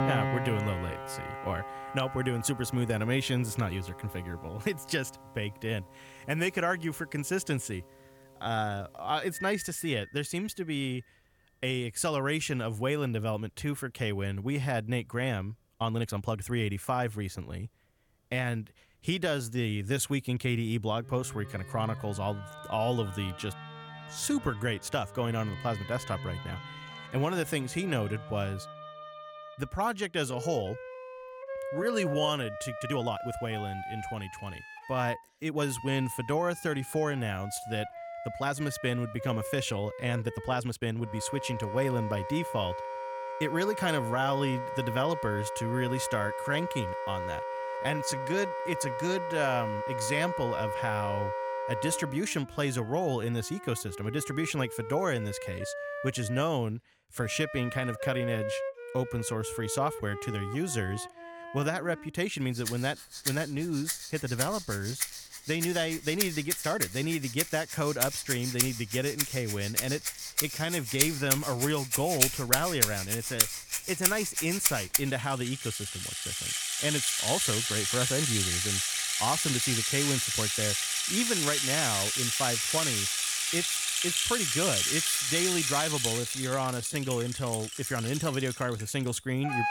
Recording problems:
background music; very loud; throughout; as loud as the speech
uneven, jittery; strongly; from 5.5 s to 1:27

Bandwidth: 17.5 kHz